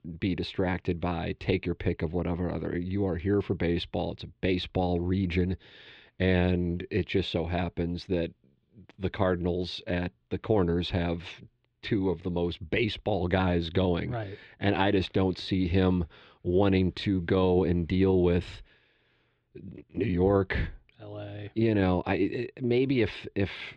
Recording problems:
muffled; slightly; fading above 3.5 kHz

